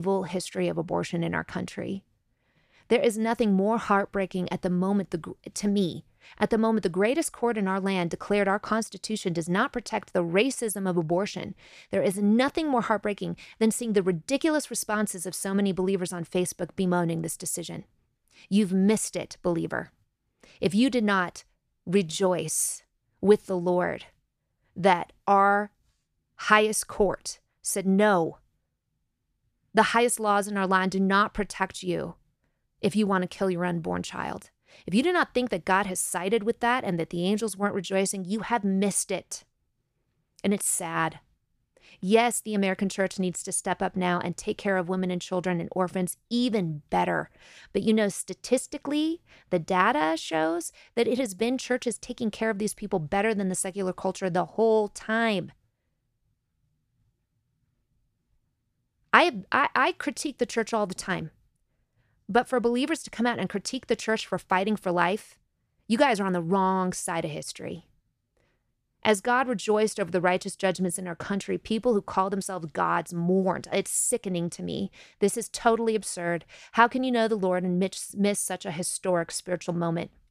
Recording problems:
abrupt cut into speech; at the start

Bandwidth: 14.5 kHz